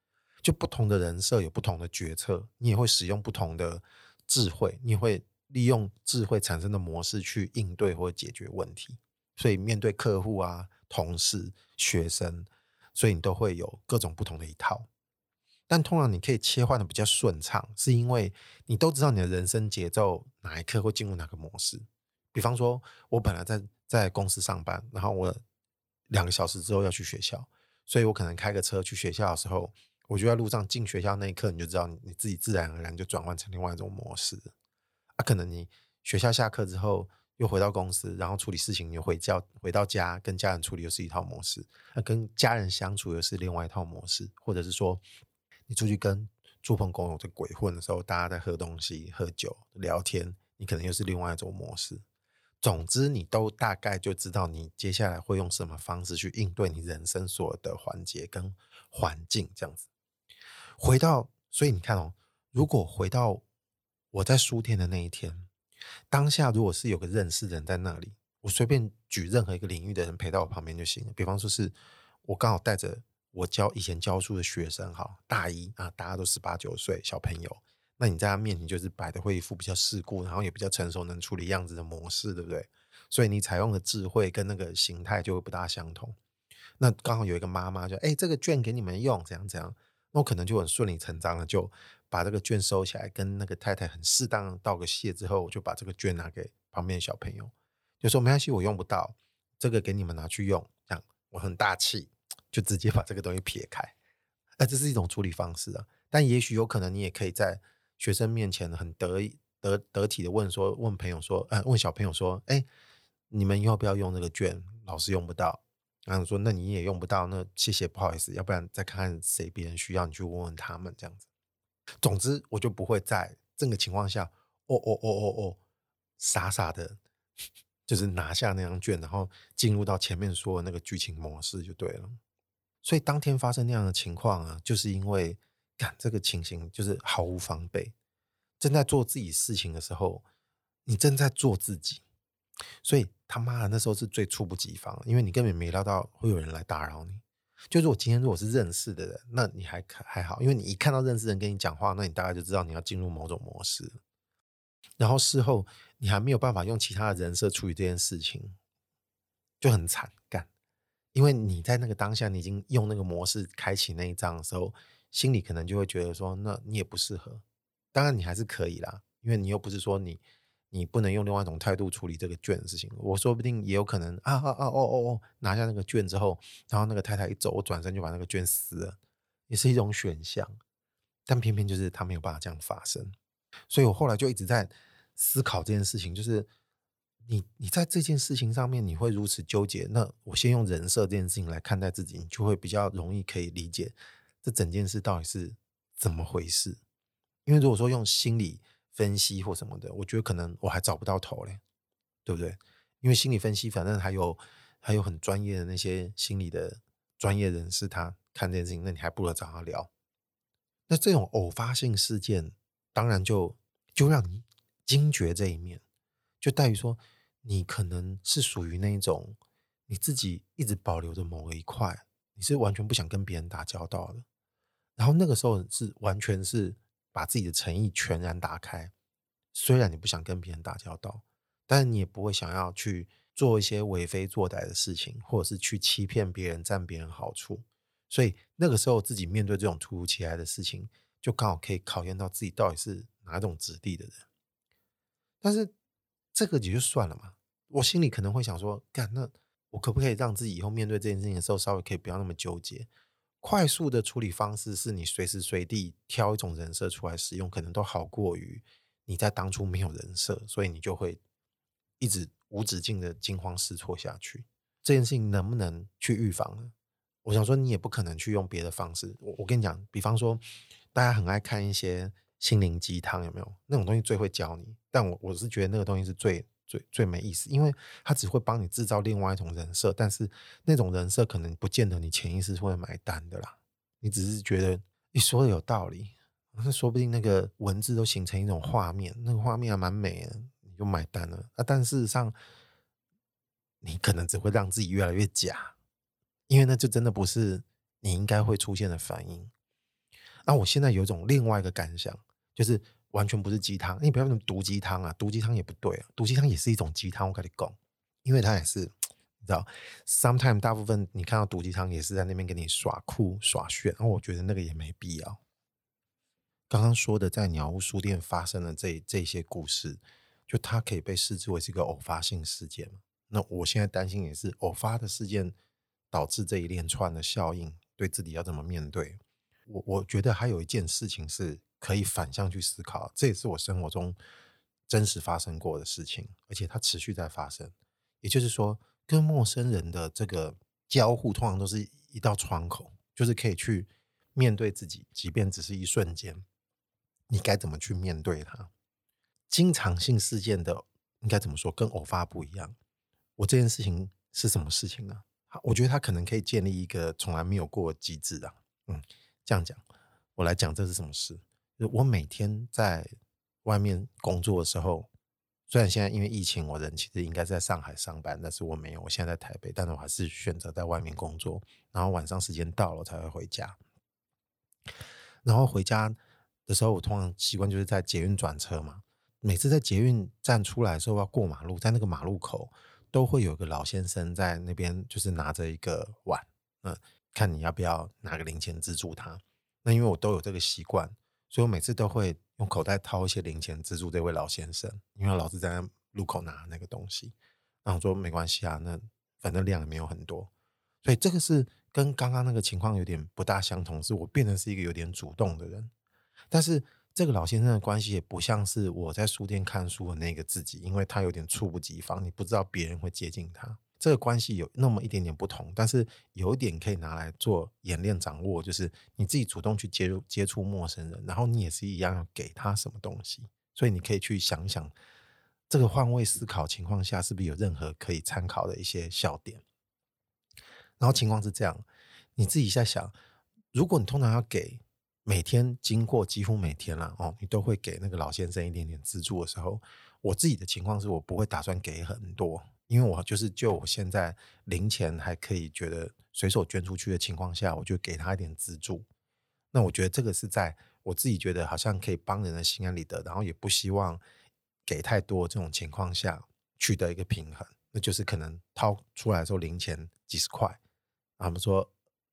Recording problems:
none

